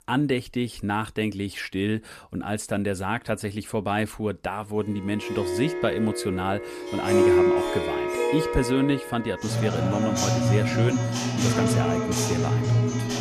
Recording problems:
background music; very loud; from 5.5 s on; 3 dB above the speech

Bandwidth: 14.5 kHz